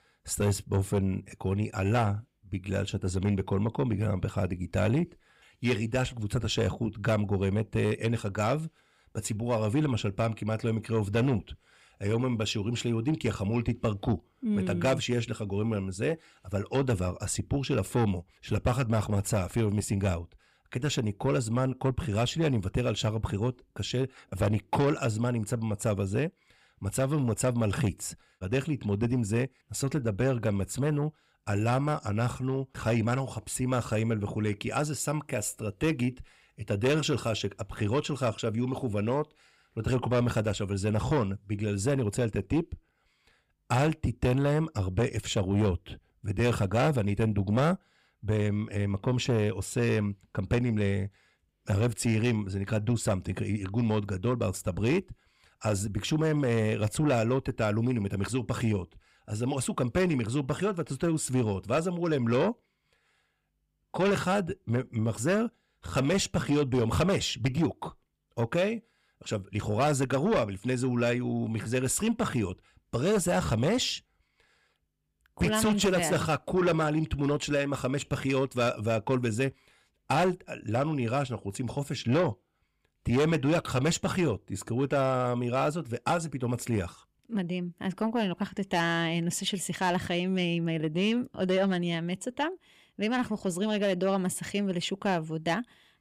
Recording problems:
distortion; slight; 10 dB below the speech

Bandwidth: 15.5 kHz